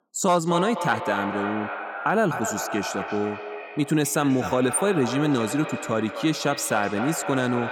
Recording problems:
echo of what is said; strong; throughout; 250 ms later, 7 dB below the speech

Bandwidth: 18.5 kHz